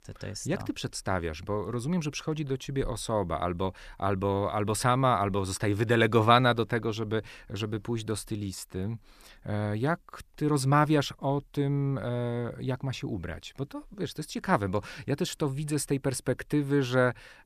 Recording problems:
none

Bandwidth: 14.5 kHz